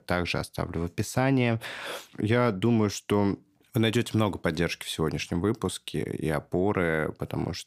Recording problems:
none

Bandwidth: 15 kHz